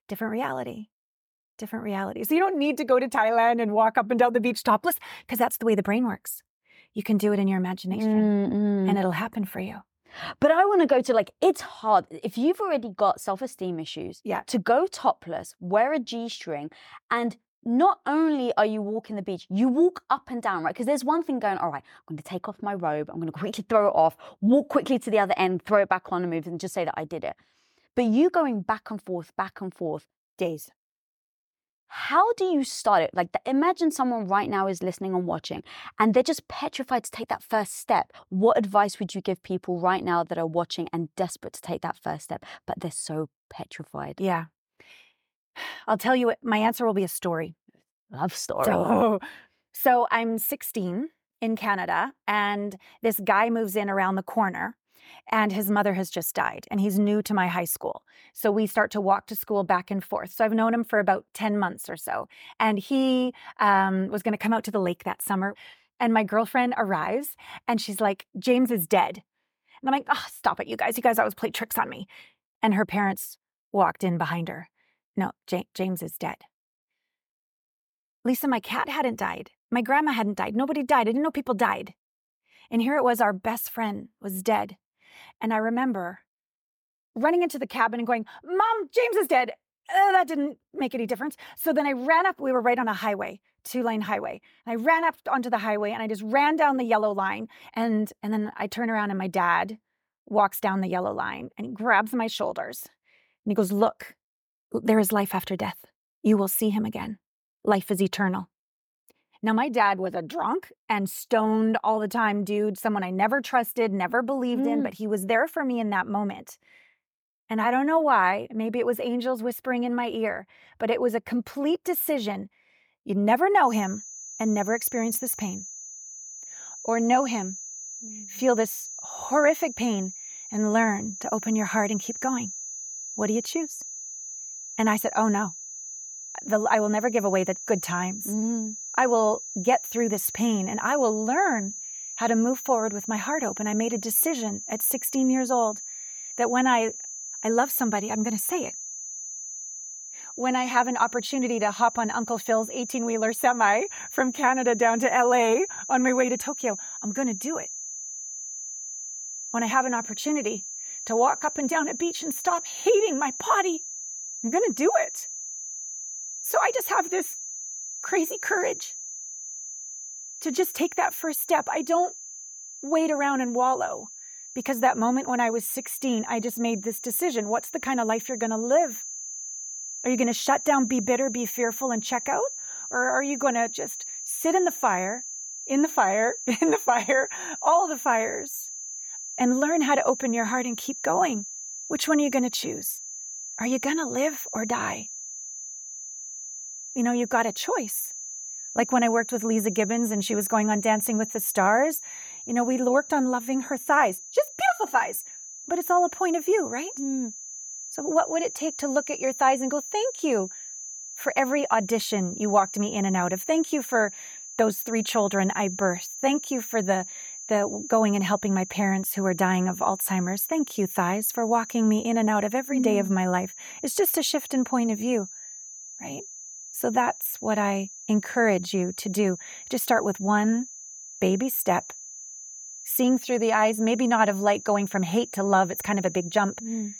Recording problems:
high-pitched whine; noticeable; from 2:04 on; 6.5 kHz, 10 dB below the speech

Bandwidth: 18.5 kHz